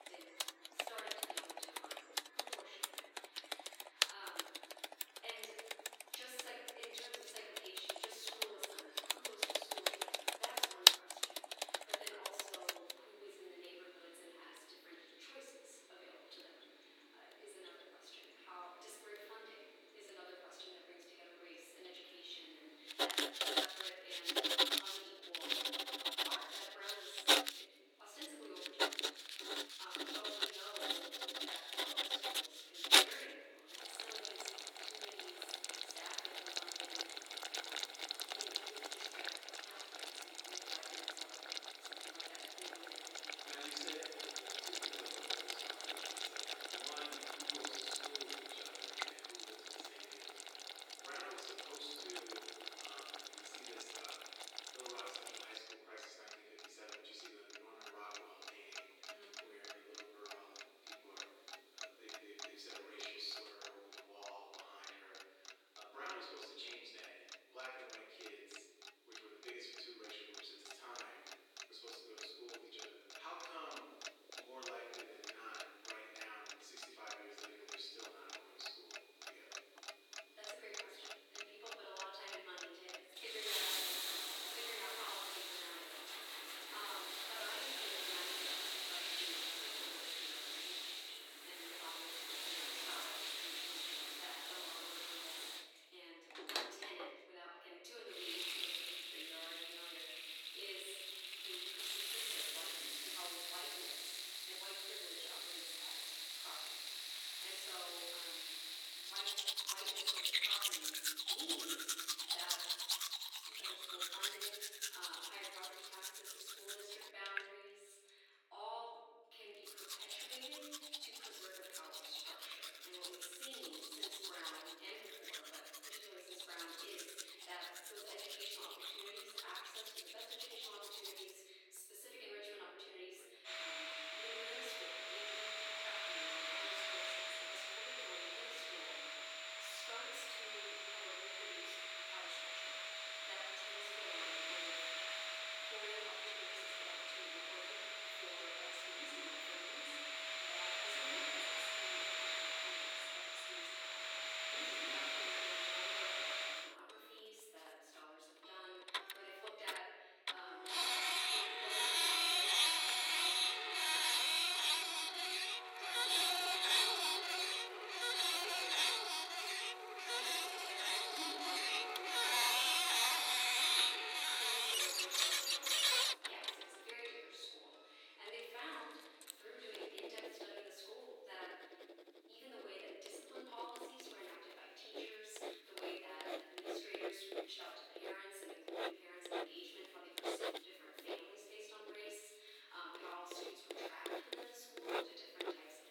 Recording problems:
off-mic speech; far
thin; very; fading below 300 Hz
room echo; noticeable; dies away in 1.3 s
household noises; very loud; throughout; 15 dB above the speech

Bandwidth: 17.5 kHz